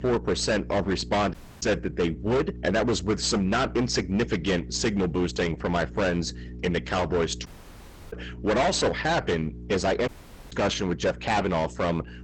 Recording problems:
distortion; heavy; 16% of the sound clipped
garbled, watery; badly; nothing above 8 kHz
electrical hum; faint; throughout; 60 Hz, 25 dB below the speech
audio cutting out; at 1.5 s, at 7.5 s for 0.5 s and at 10 s

